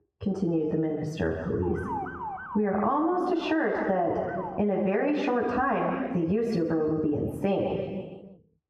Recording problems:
squashed, flat; heavily
room echo; noticeable; dies away in 1.2 s
muffled; slightly; fading above 2.5 kHz
off-mic speech; somewhat distant
siren; noticeable; from 1.5 to 4.5 s; peak 7 dB below the speech

